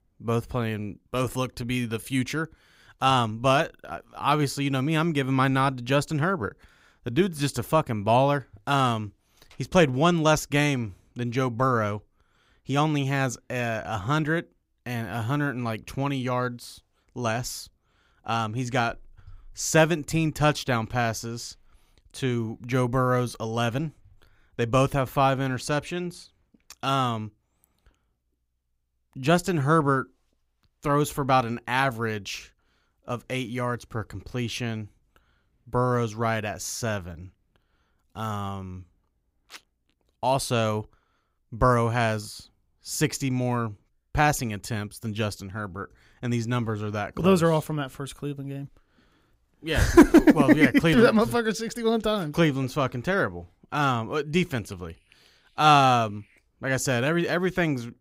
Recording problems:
none

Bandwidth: 15.5 kHz